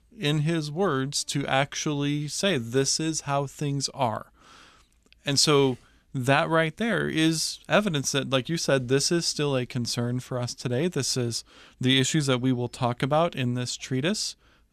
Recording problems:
none

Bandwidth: 14 kHz